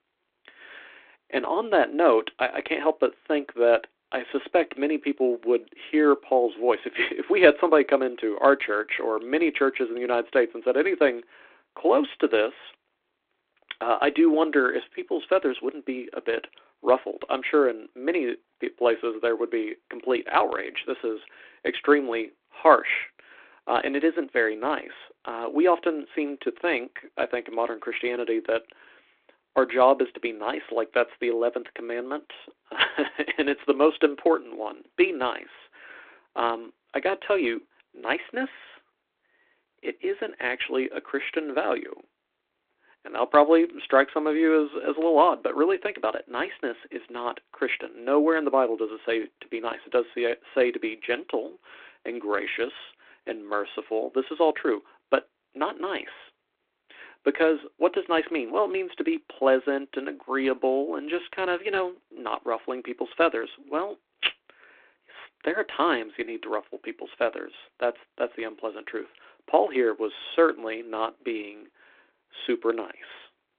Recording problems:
phone-call audio; nothing above 3.5 kHz

